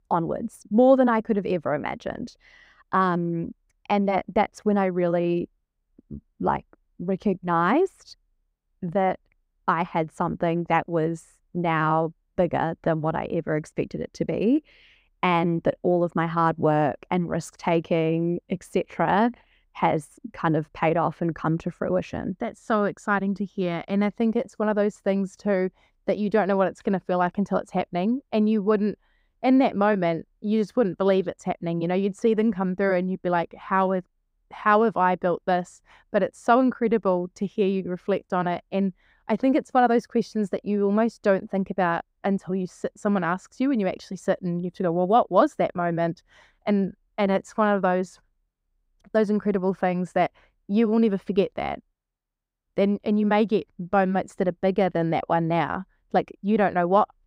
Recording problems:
muffled; slightly; fading above 2 kHz

